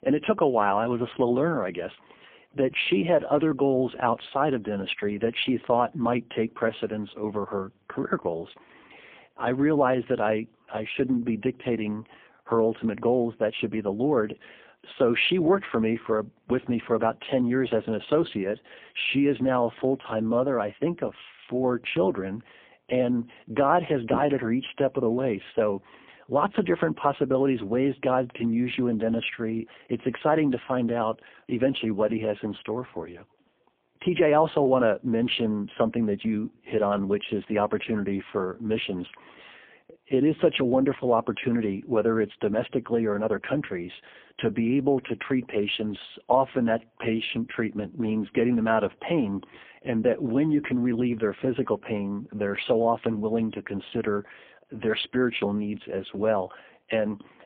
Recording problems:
phone-call audio; poor line

